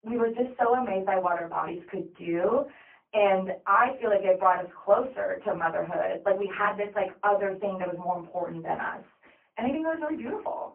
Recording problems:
phone-call audio; poor line
off-mic speech; far
room echo; very slight; dies away in 0.2 s

